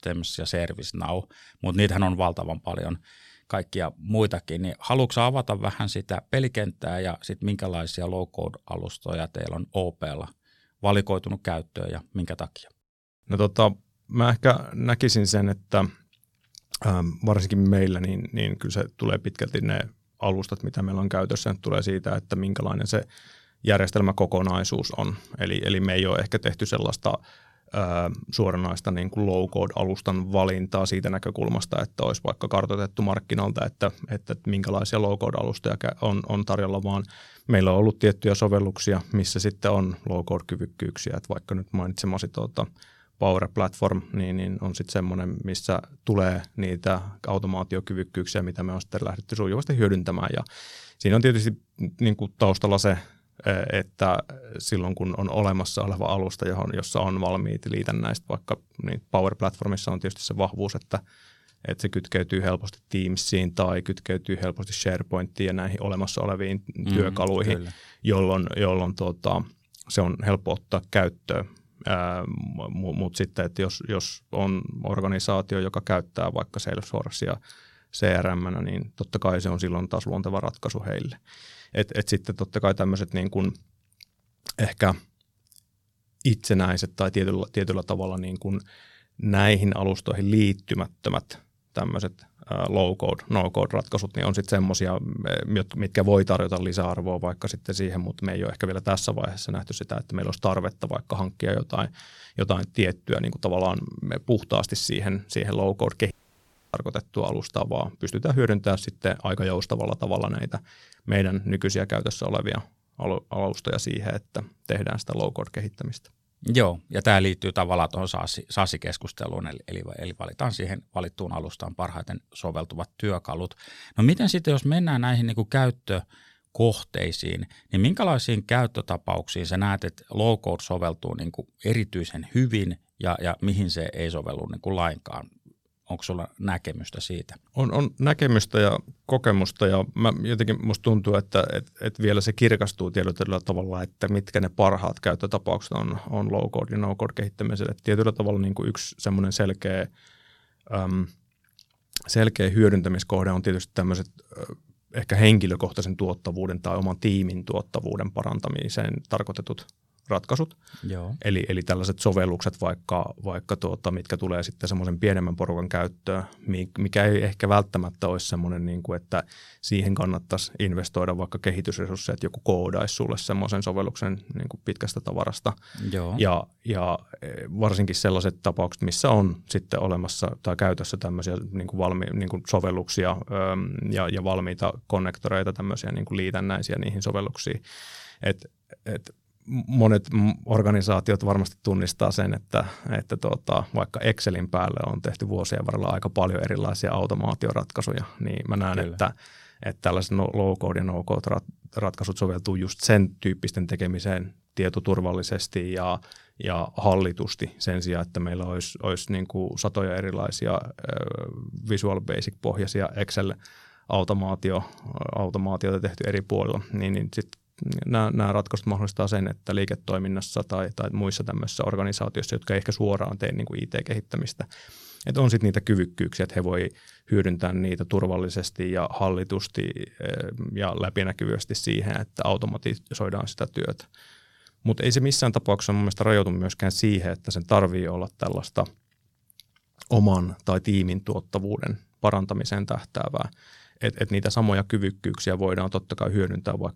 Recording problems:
audio cutting out; at 1:46 for 0.5 s

